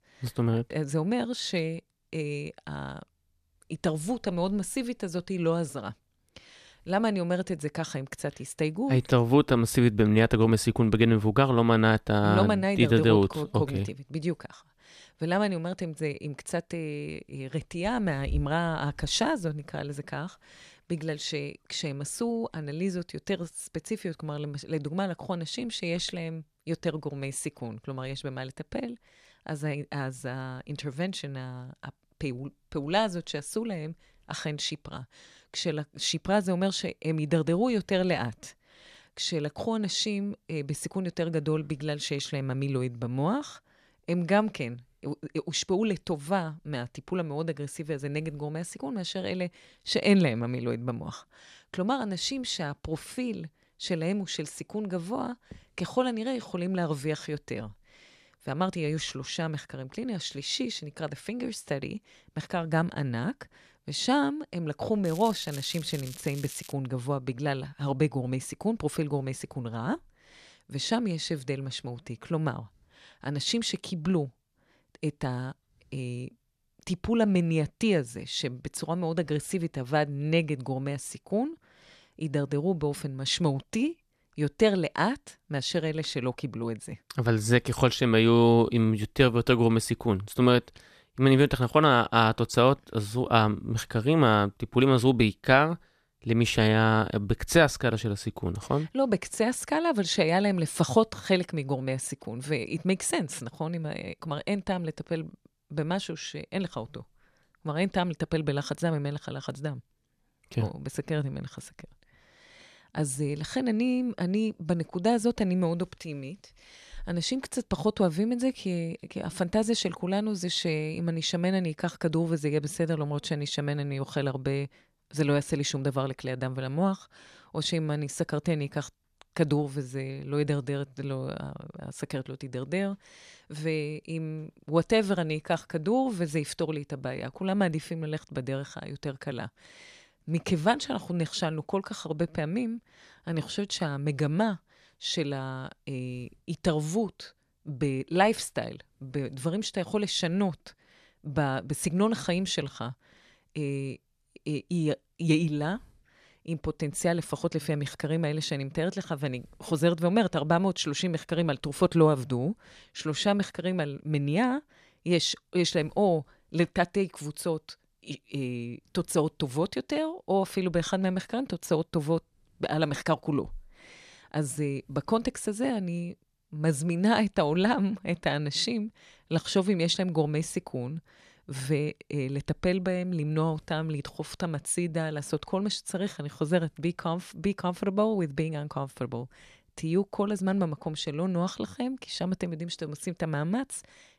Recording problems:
crackling; noticeable; from 1:05 to 1:07; 15 dB below the speech

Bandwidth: 14 kHz